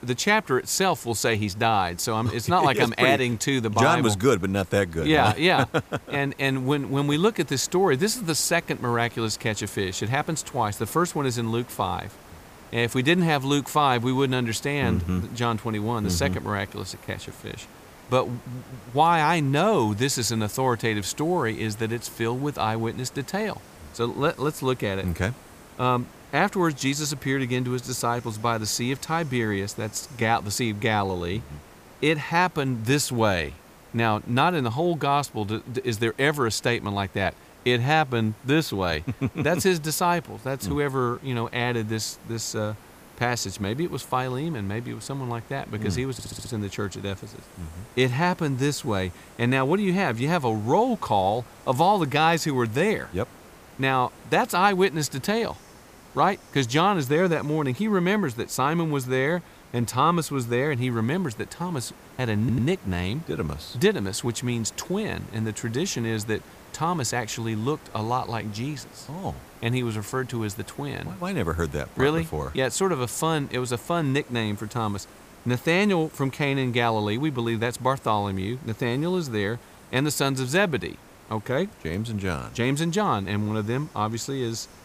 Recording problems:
hiss; faint; throughout; 25 dB below the speech
audio stuttering; at 46 s and at 1:02

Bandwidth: 15 kHz